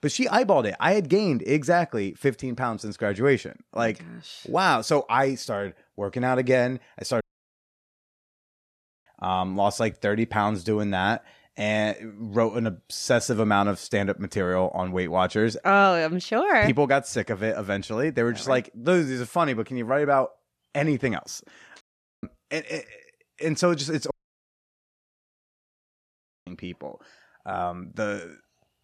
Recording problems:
audio cutting out; at 7 s for 2 s, at 22 s and at 24 s for 2.5 s

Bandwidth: 13.5 kHz